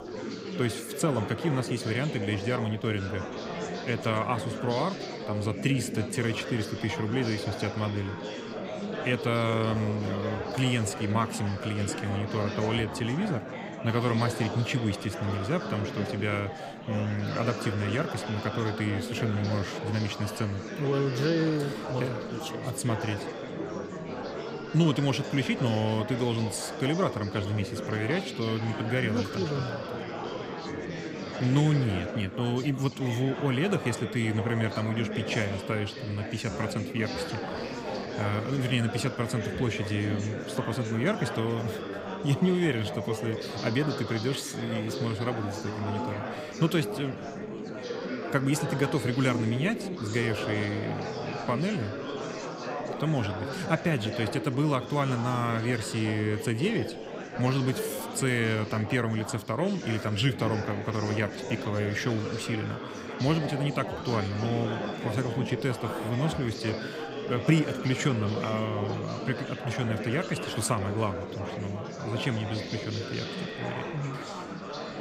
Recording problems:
chatter from many people; loud; throughout; 5 dB below the speech

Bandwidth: 15.5 kHz